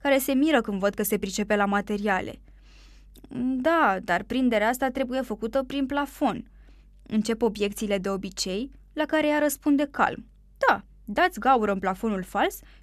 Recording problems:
none

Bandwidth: 14 kHz